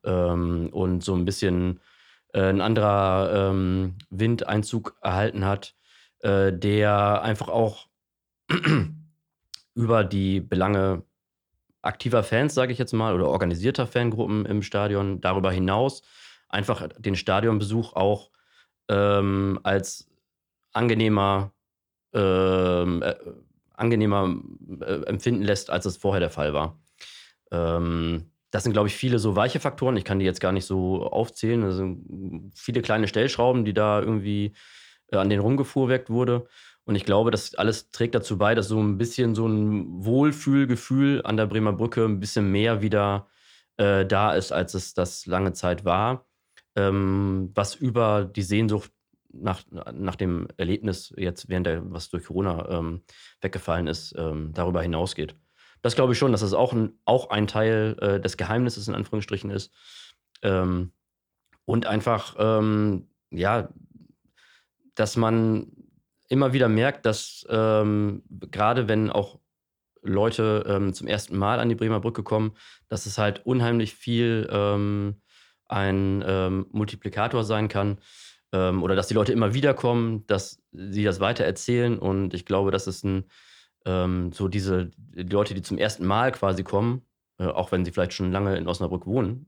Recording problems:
none

